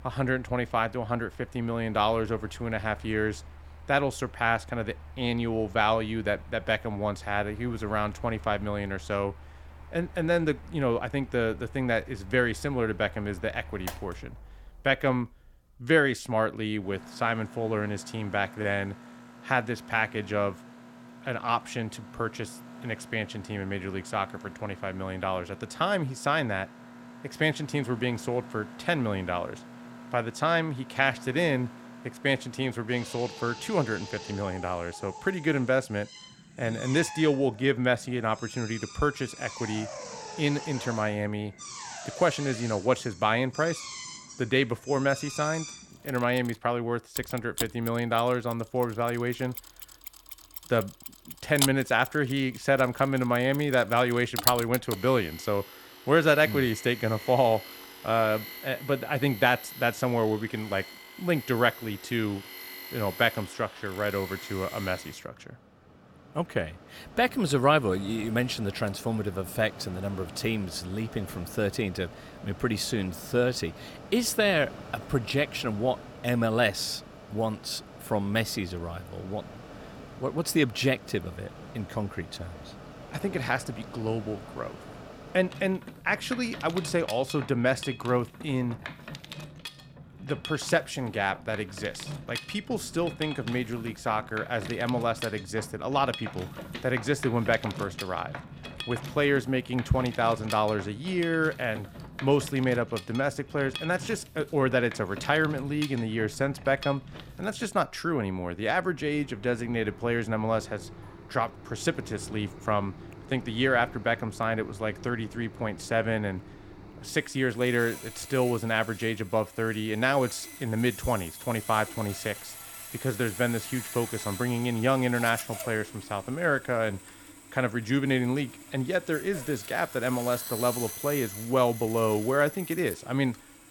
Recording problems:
machinery noise; noticeable; throughout; 15 dB below the speech

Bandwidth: 17.5 kHz